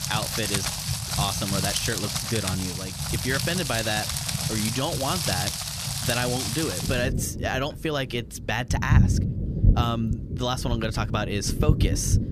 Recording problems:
rain or running water; very loud; throughout; 2 dB above the speech

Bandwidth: 14.5 kHz